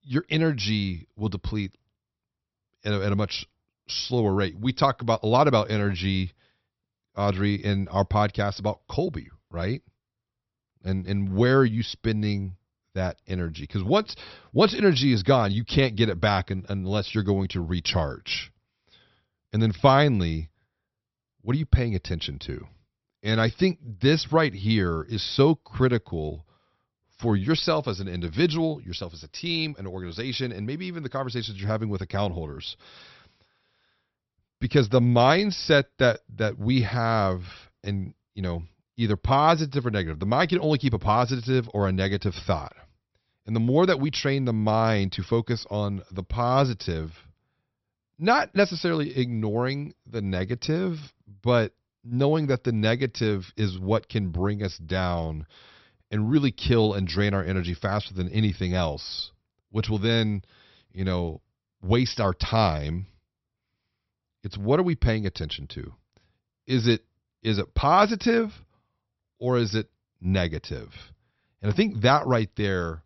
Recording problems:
high frequencies cut off; noticeable; nothing above 5.5 kHz

